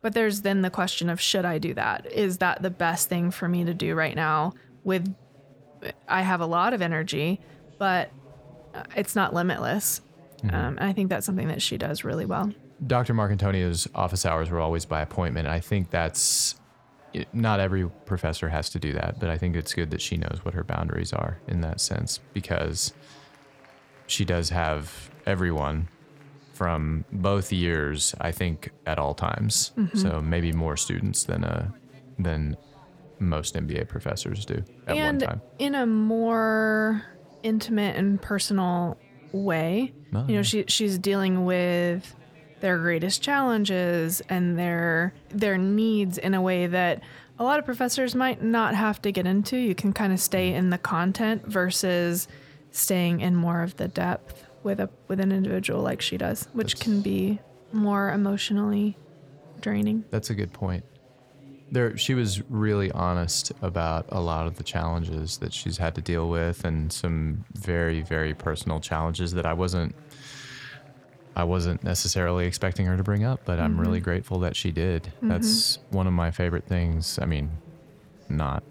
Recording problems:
chatter from many people; faint; throughout; 25 dB below the speech

